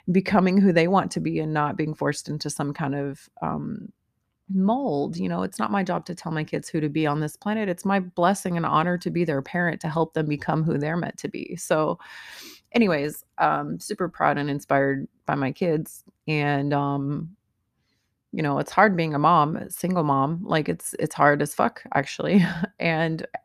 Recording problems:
none

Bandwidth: 14.5 kHz